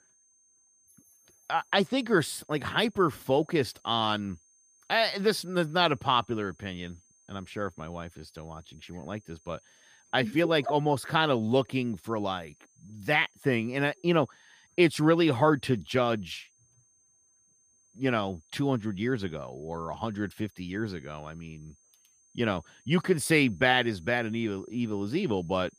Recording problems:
high-pitched whine; faint; throughout; 6.5 kHz, 35 dB below the speech

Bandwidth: 15 kHz